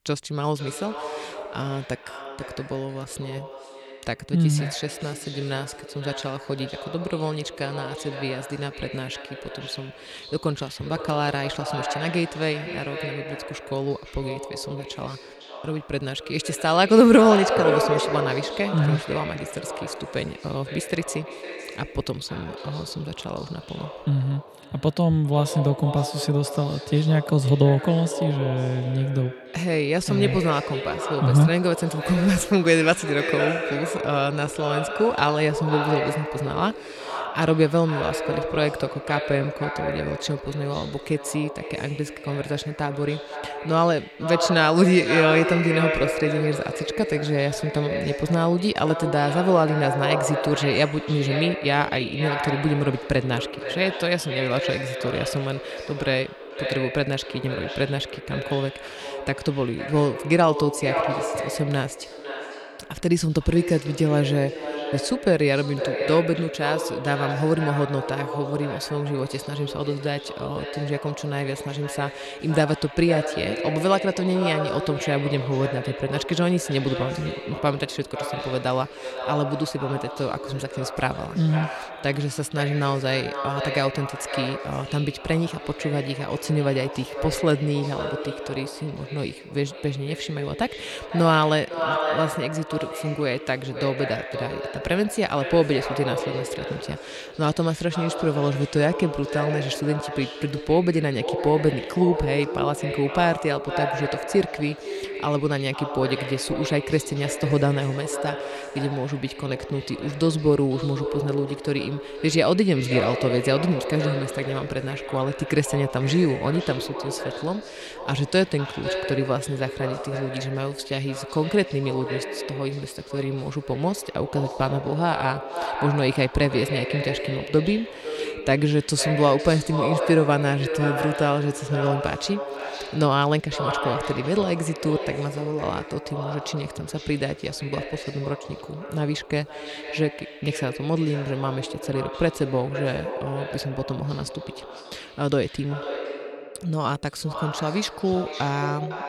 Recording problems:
echo of what is said; strong; throughout; 500 ms later, 7 dB below the speech

